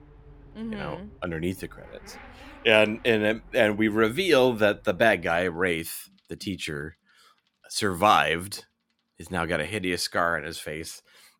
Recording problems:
traffic noise; faint; throughout; 25 dB below the speech

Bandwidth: 17 kHz